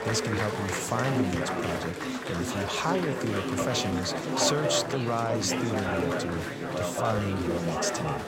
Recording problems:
chatter from many people; very loud; throughout; as loud as the speech

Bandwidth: 16 kHz